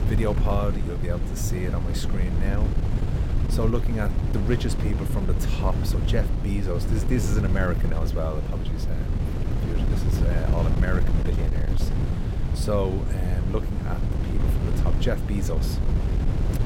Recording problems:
wind noise on the microphone; heavy; 4 dB below the speech

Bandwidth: 16.5 kHz